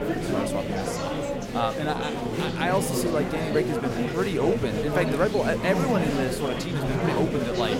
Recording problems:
murmuring crowd; very loud; throughout; as loud as the speech

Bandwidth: 16 kHz